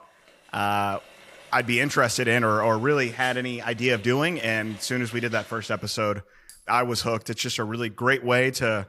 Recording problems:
household noises; faint; throughout; 25 dB below the speech

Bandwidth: 15.5 kHz